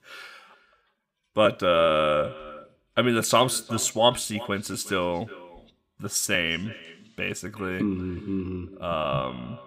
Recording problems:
echo of what is said; faint; throughout; 360 ms later, 20 dB below the speech

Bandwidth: 15.5 kHz